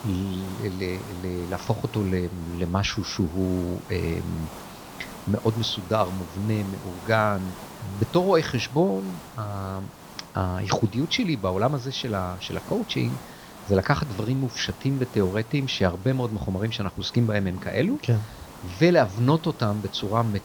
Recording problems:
high frequencies cut off; noticeable; nothing above 6.5 kHz
hiss; noticeable; throughout; 15 dB below the speech

